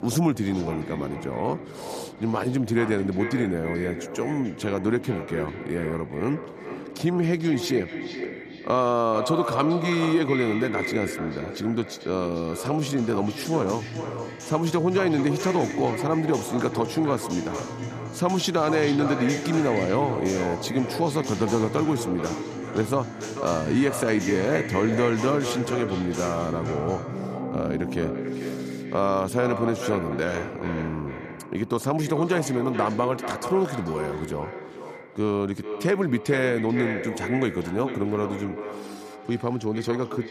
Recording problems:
echo of what is said; strong; throughout; 440 ms later, 8 dB below the speech
background music; noticeable; throughout; 15 dB below the speech

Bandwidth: 14.5 kHz